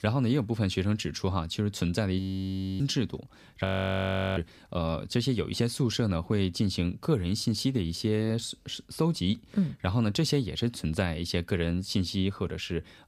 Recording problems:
audio freezing; at 2 s for 0.5 s and at 3.5 s for 0.5 s

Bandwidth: 15 kHz